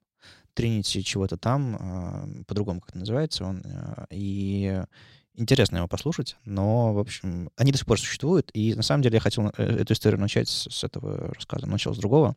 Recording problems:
none

